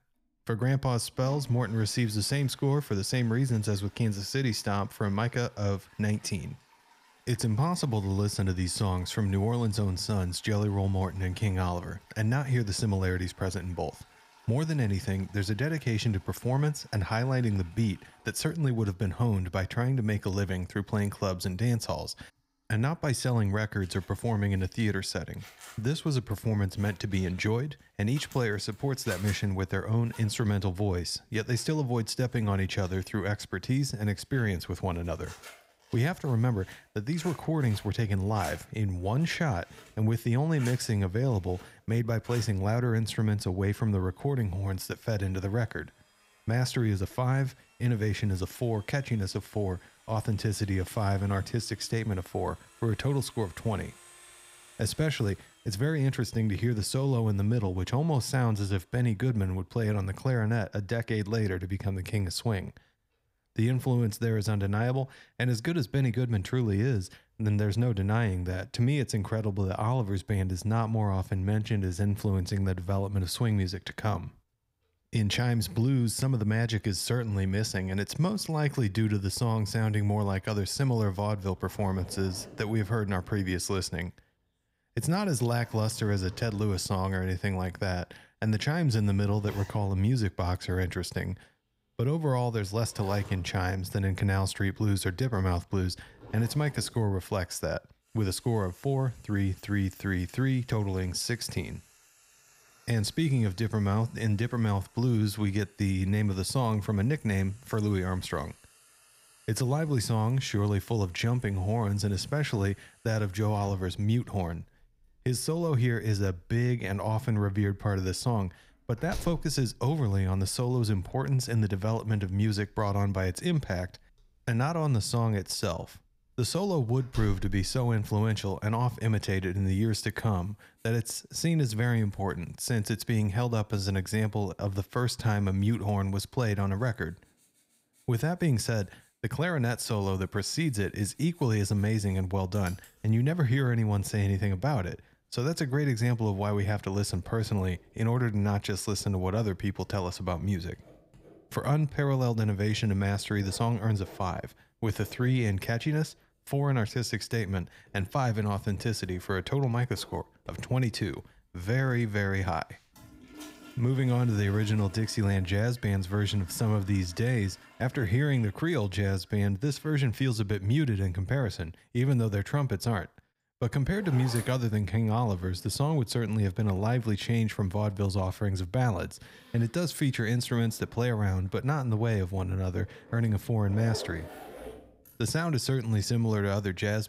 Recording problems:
household noises; faint; throughout; 25 dB below the speech

